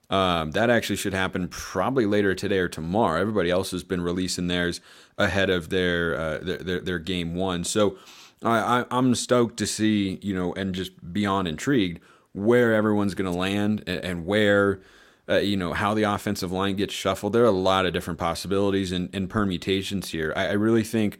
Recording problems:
none

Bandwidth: 16 kHz